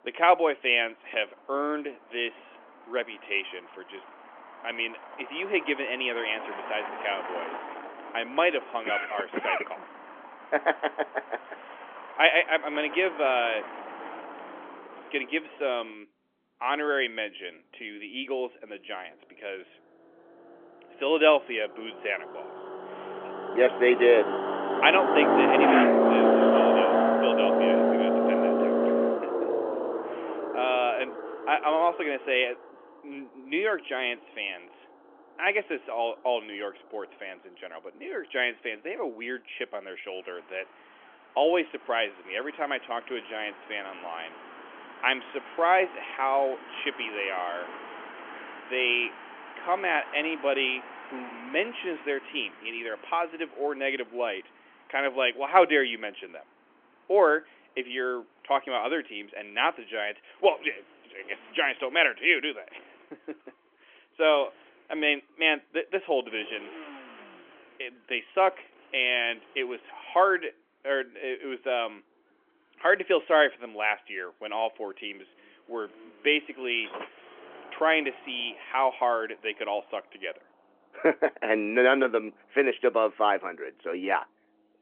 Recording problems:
phone-call audio; nothing above 3.5 kHz
traffic noise; loud; throughout; 1 dB below the speech

